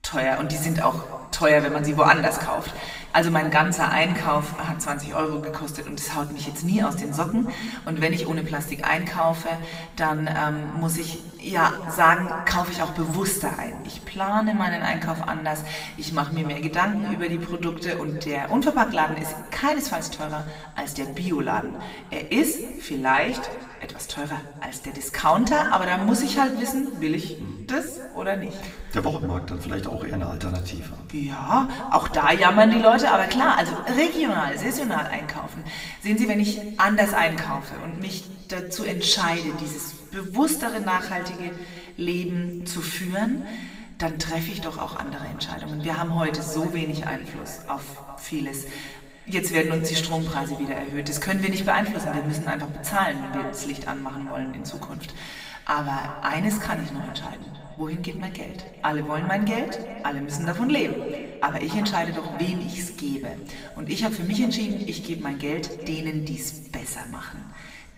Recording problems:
echo of what is said; noticeable; from 45 s on; 390 ms later, 20 dB below the speech
room echo; slight; dies away in 1.4 s
off-mic speech; somewhat distant

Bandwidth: 15.5 kHz